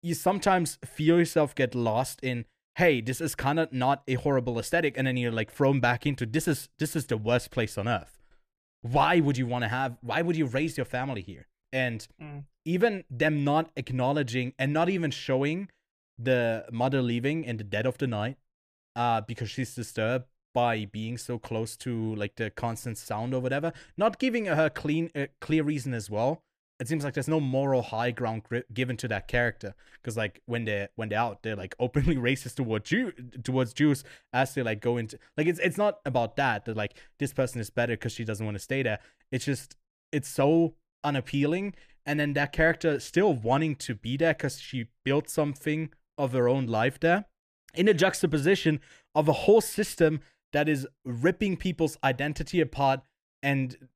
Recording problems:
none

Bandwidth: 14.5 kHz